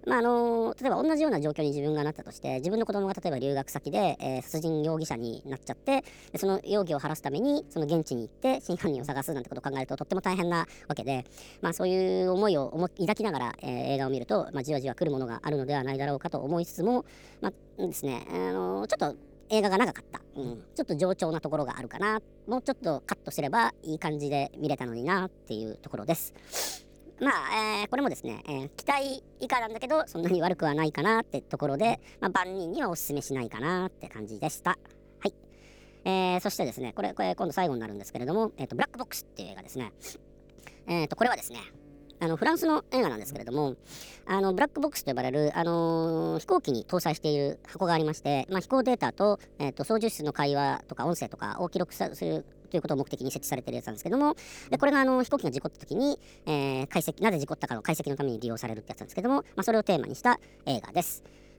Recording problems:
wrong speed and pitch; too fast and too high; 1.5 times normal speed
electrical hum; faint; throughout; 50 Hz, 30 dB below the speech

